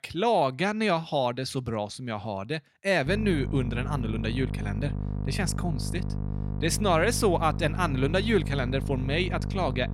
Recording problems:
electrical hum; noticeable; from 3 s on; 50 Hz, 15 dB below the speech

